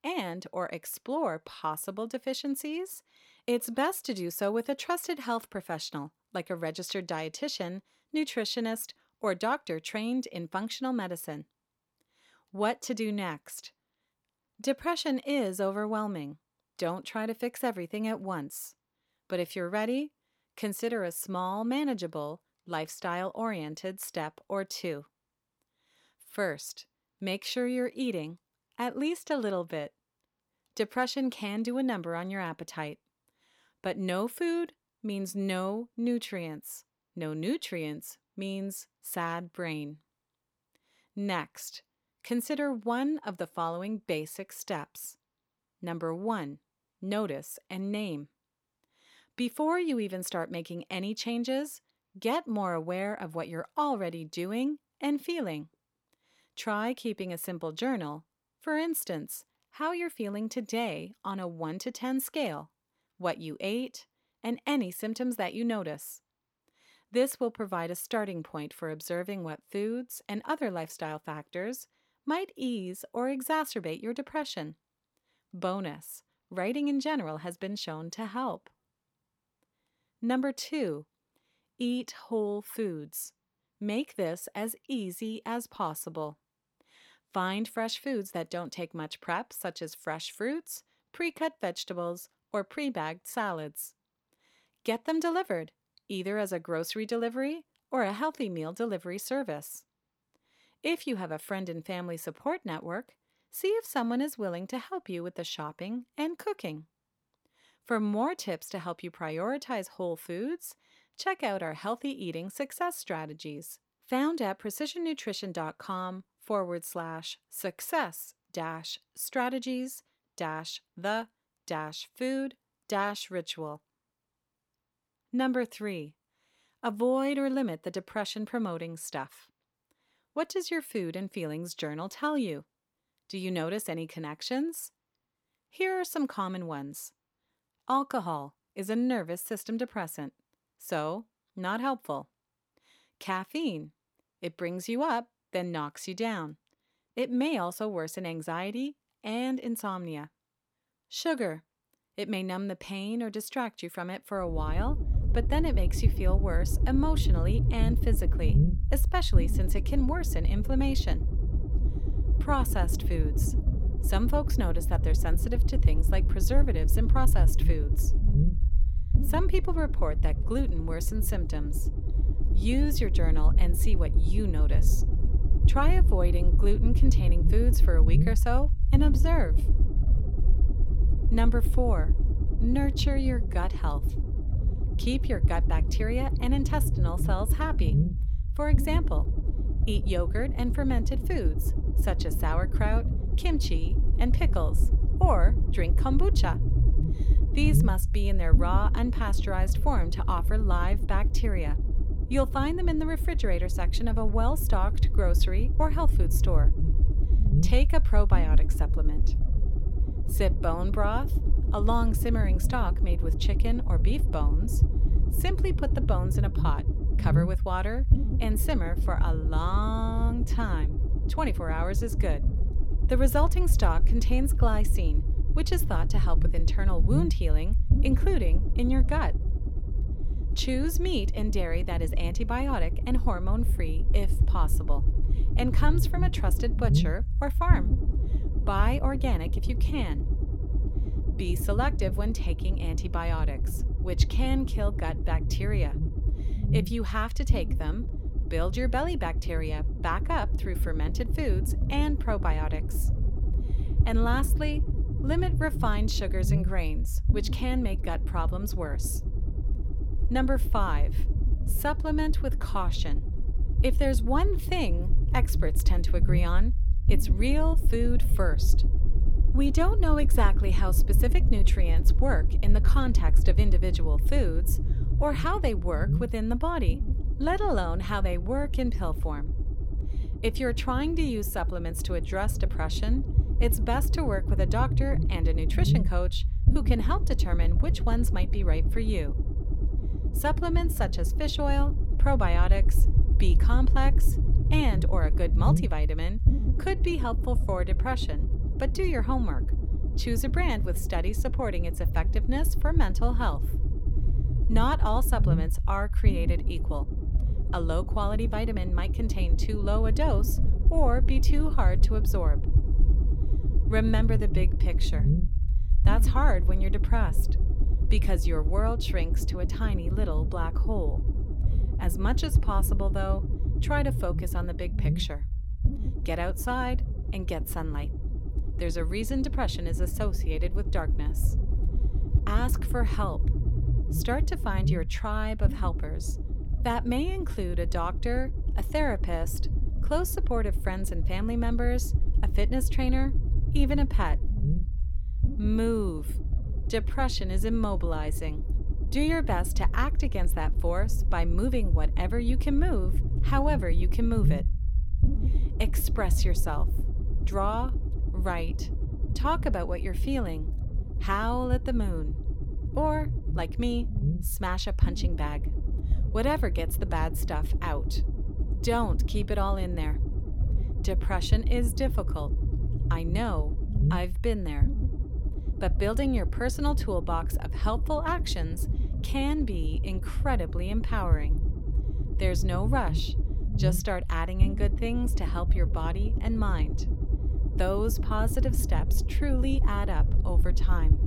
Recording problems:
low rumble; noticeable; from 2:35 on; 10 dB below the speech

